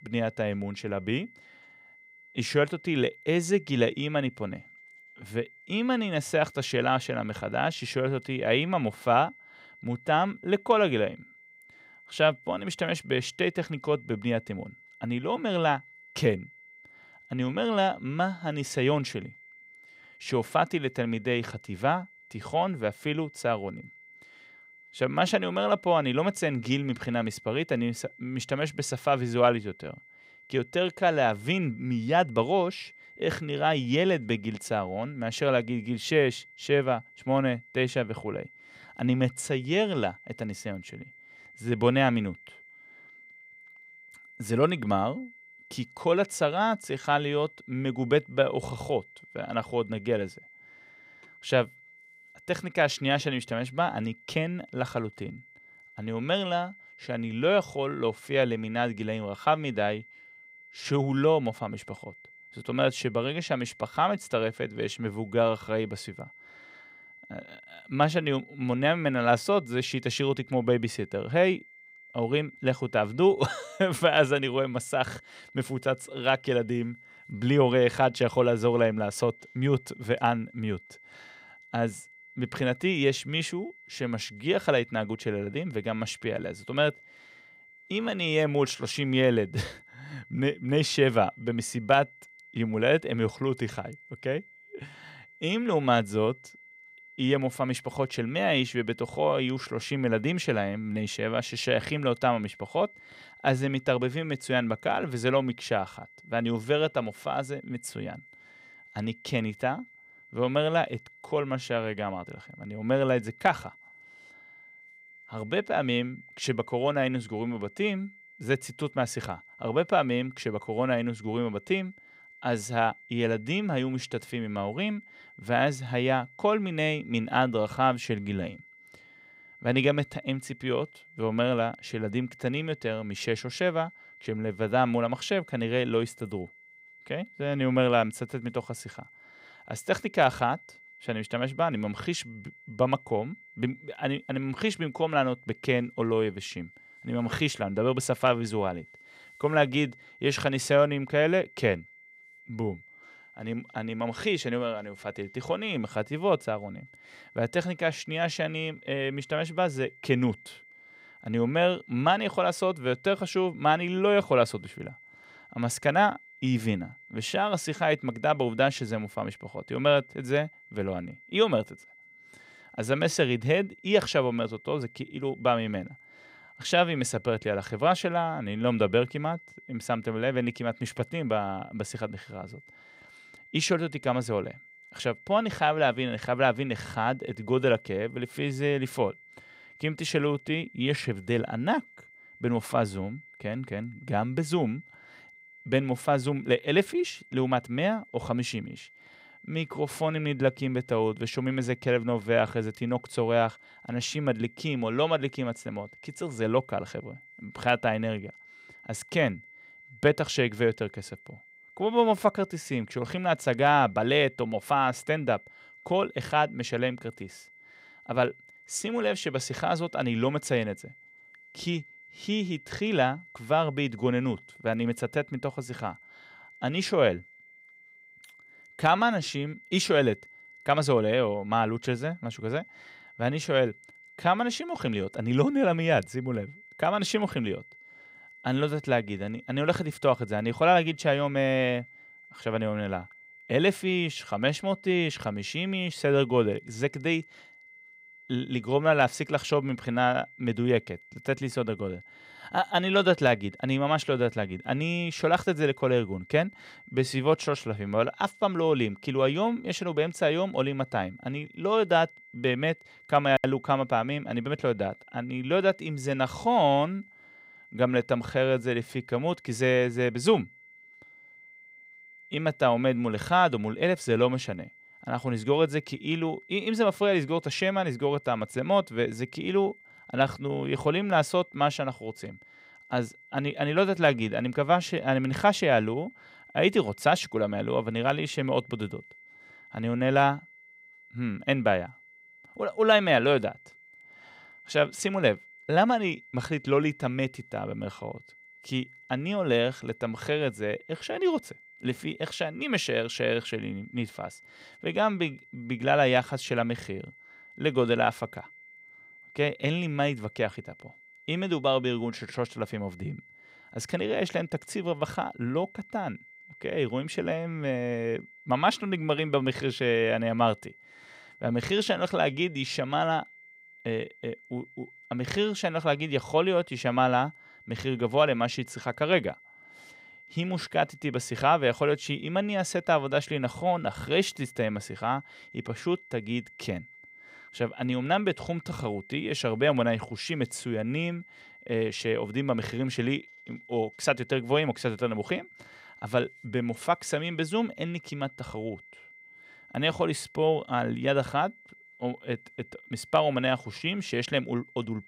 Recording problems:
high-pitched whine; faint; throughout; 2 kHz, 25 dB below the speech

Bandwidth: 15.5 kHz